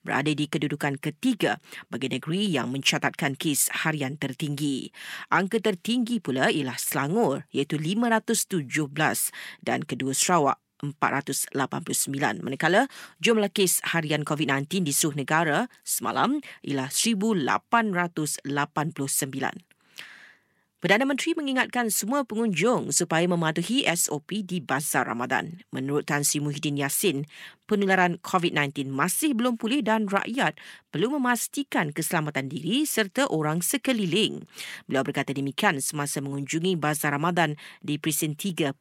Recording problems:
none

